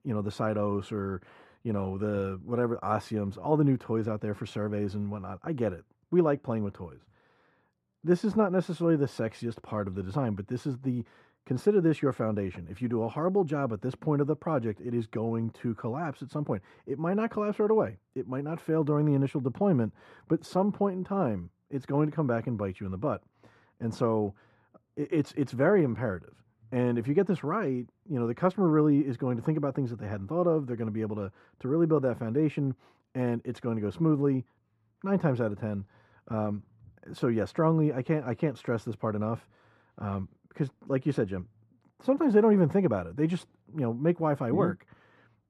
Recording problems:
muffled; very; fading above 2.5 kHz

